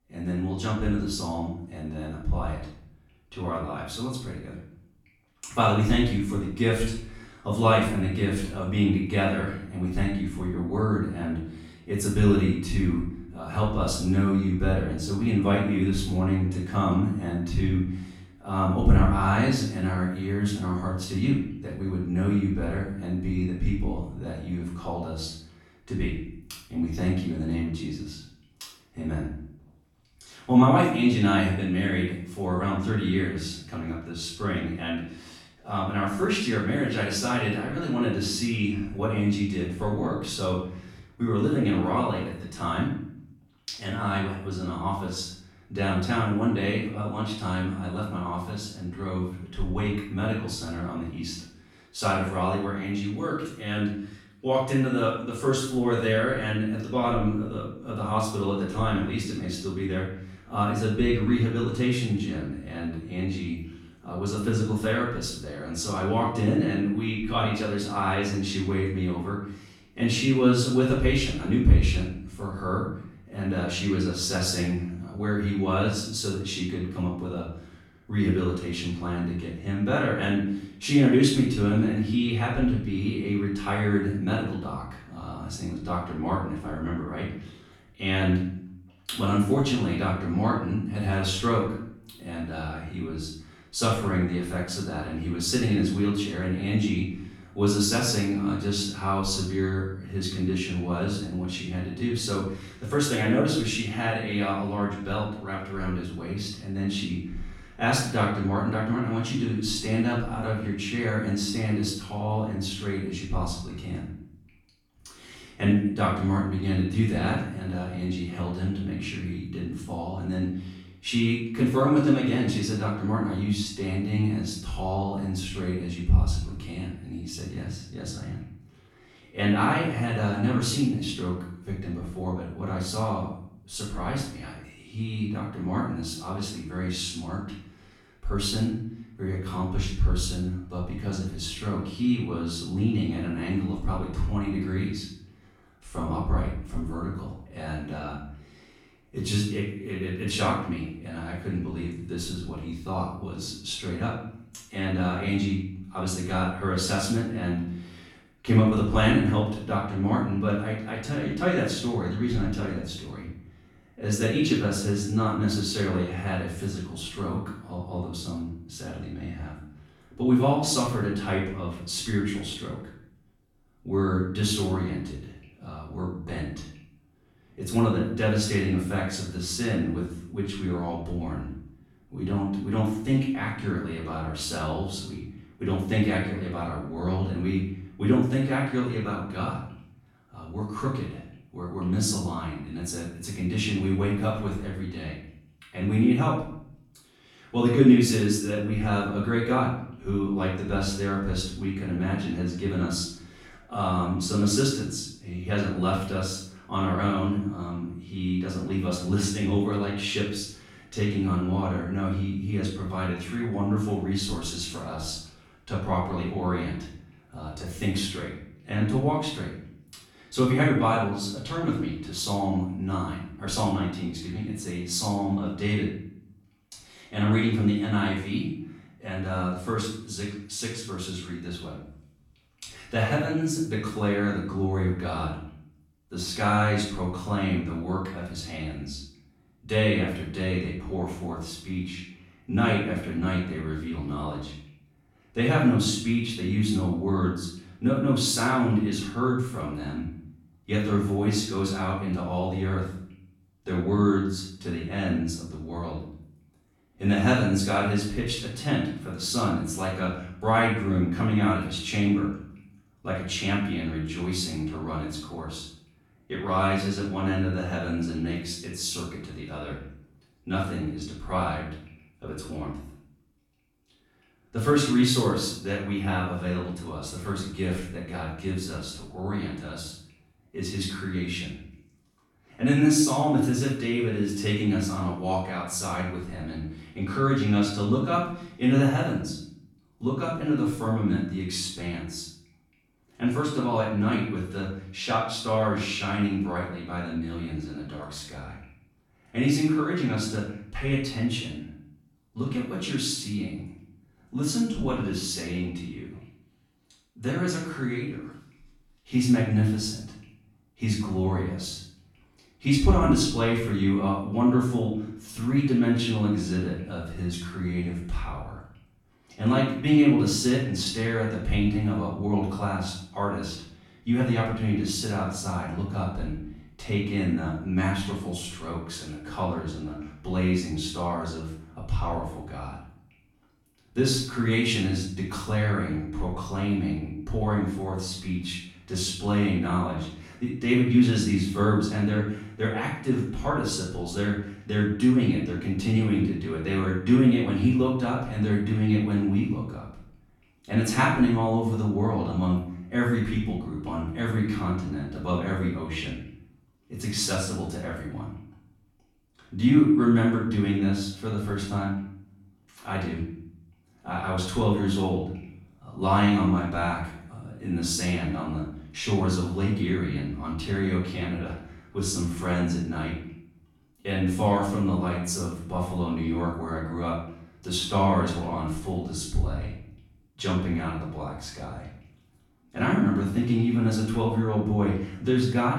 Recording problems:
off-mic speech; far
room echo; noticeable; dies away in 0.6 s

